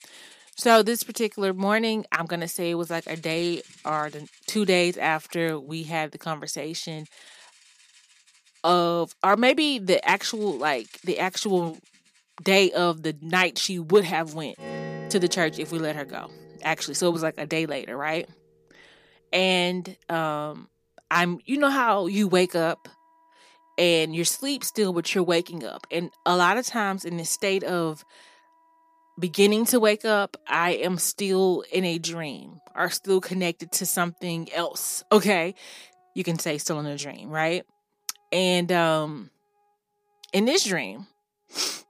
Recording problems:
background music; faint; throughout; 25 dB below the speech

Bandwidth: 15 kHz